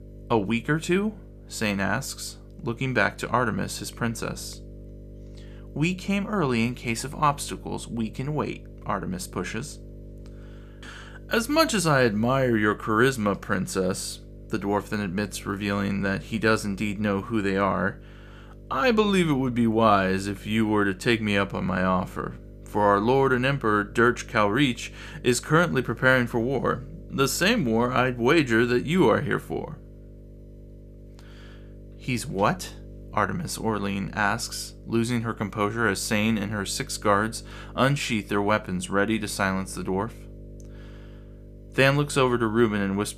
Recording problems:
electrical hum; faint; throughout; 50 Hz, 25 dB below the speech

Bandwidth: 14.5 kHz